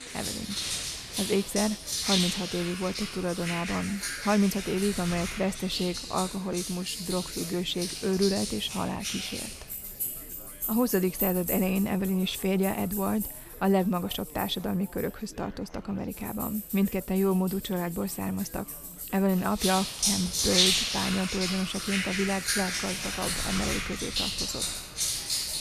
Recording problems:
household noises; loud; throughout; 1 dB below the speech
chatter from many people; faint; throughout; 20 dB below the speech

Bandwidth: 14 kHz